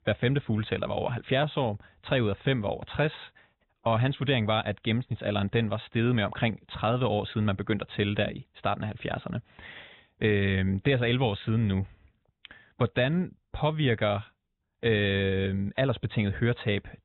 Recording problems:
high frequencies cut off; severe; nothing above 4 kHz

